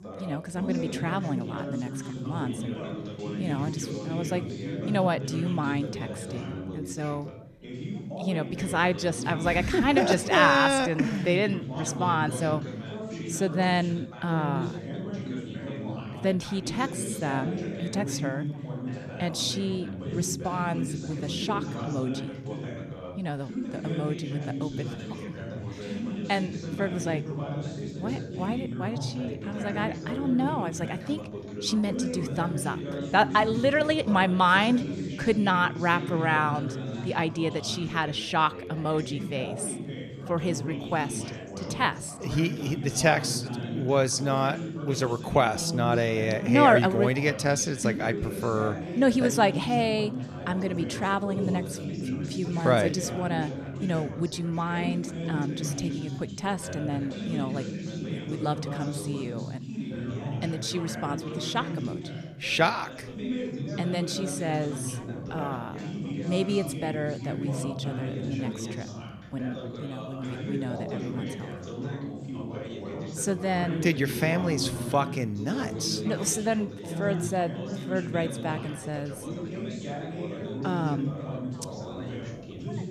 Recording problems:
background chatter; loud; throughout; 3 voices, 7 dB below the speech

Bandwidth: 14 kHz